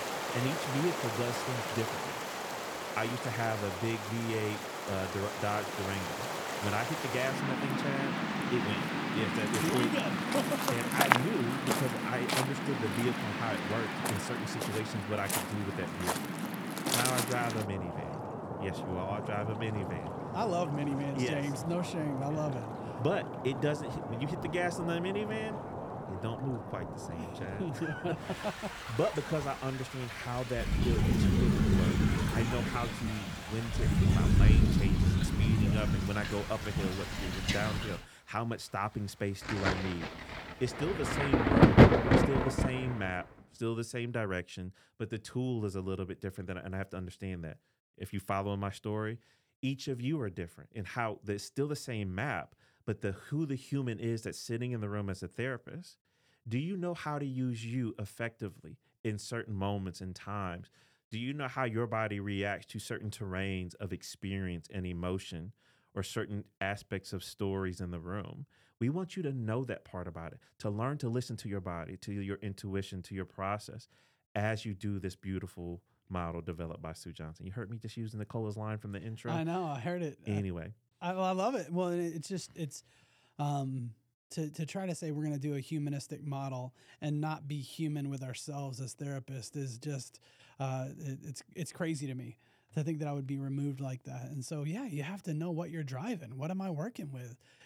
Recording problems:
rain or running water; very loud; until 43 s; 4 dB above the speech

